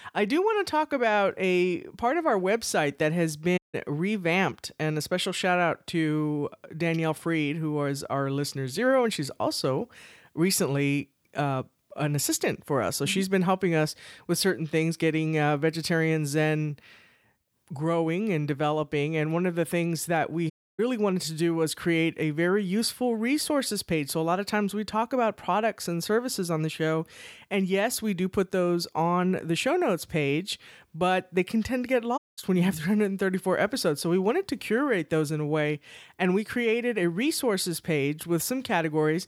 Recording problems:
audio cutting out; at 3.5 s, at 21 s and at 32 s

